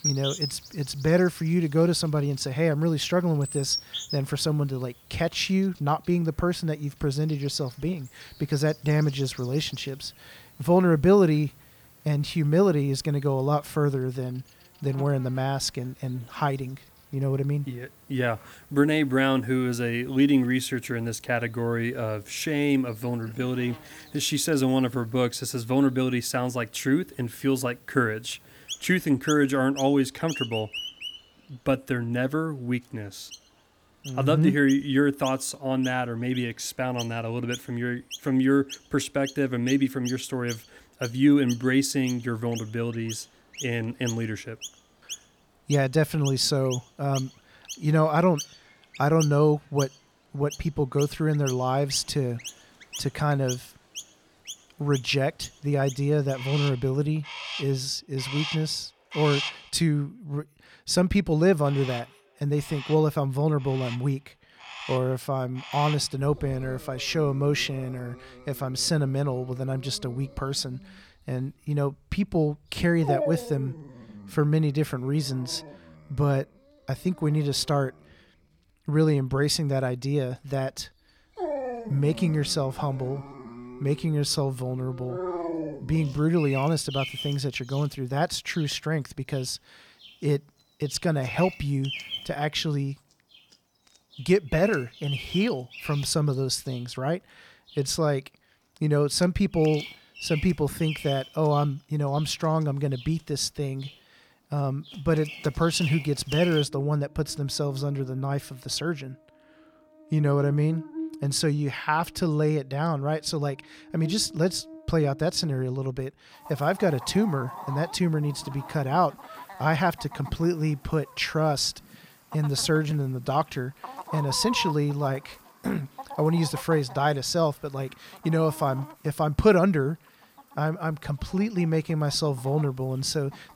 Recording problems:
animal sounds; noticeable; throughout; 10 dB below the speech

